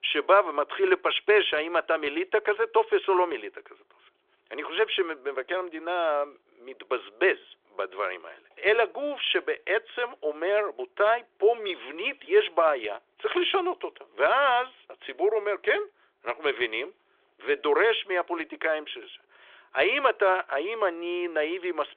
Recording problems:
phone-call audio; nothing above 3.5 kHz

